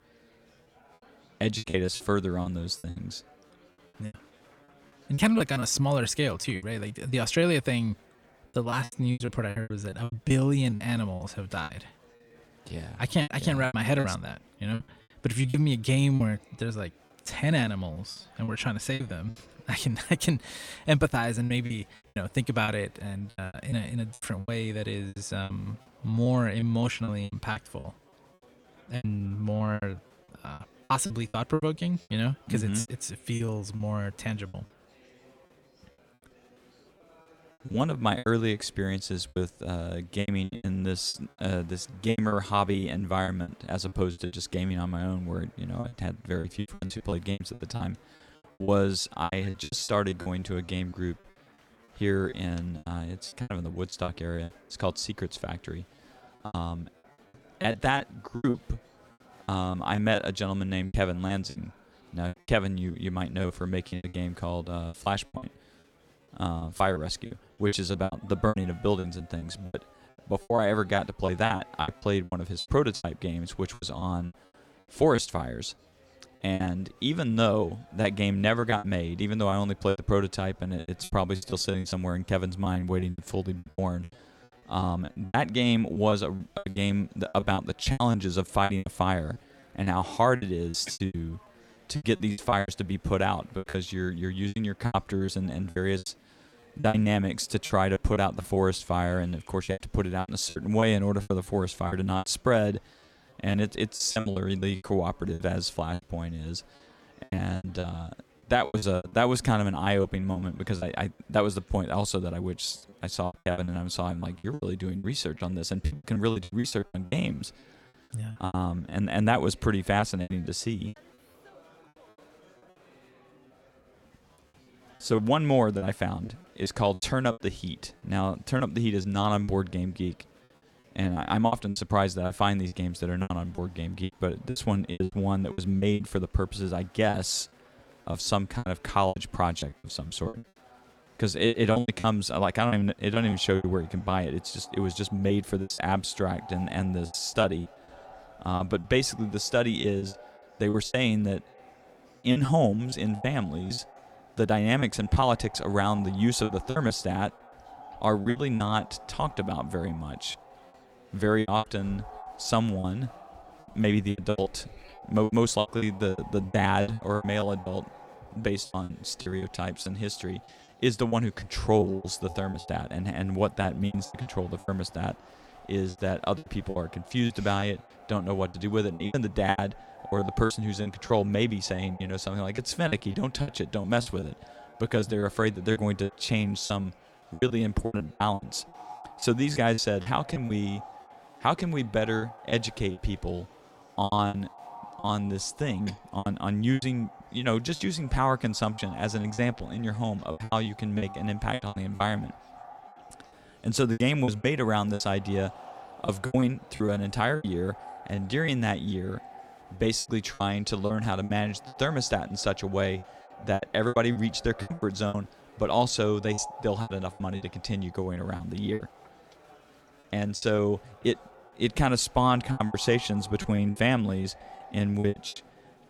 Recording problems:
echo of what is said; faint; from 2:23 on; 250 ms later, 20 dB below the speech
murmuring crowd; faint; throughout; 30 dB below the speech
choppy; very; 14% of the speech affected

